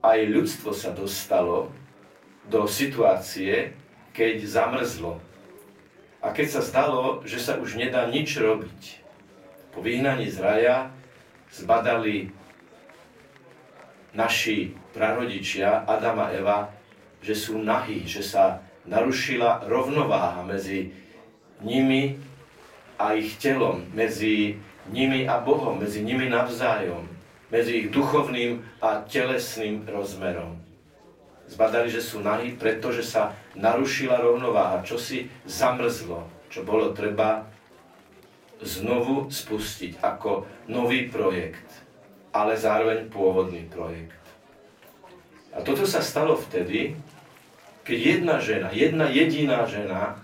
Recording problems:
off-mic speech; far
room echo; slight; dies away in 0.3 s
chatter from many people; faint; throughout; 25 dB below the speech

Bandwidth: 16 kHz